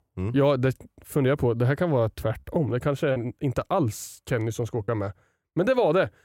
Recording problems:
choppy; occasionally; 1% of the speech affected

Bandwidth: 16 kHz